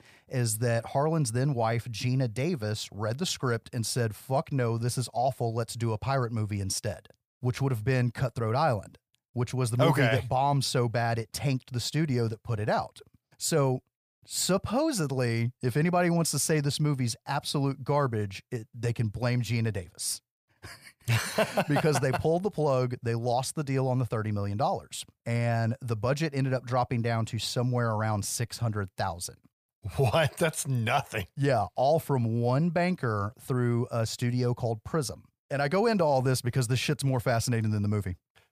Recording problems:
none

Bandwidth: 15 kHz